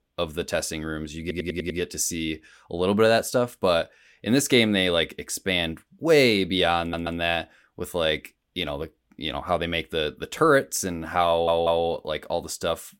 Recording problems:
audio stuttering; at 1 s, at 7 s and at 11 s

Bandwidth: 16.5 kHz